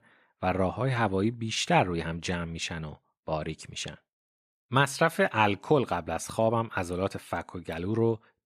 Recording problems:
none

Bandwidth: 14.5 kHz